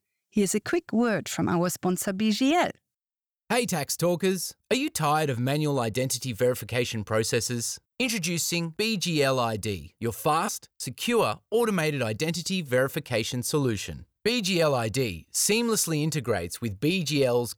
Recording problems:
none

